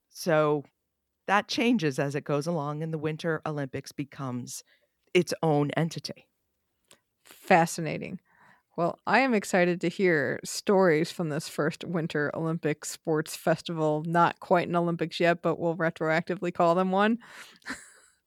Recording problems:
none

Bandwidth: 18.5 kHz